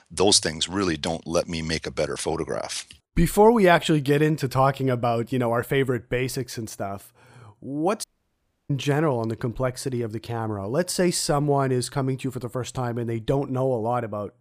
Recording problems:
audio cutting out; at 8 s for 0.5 s

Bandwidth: 15 kHz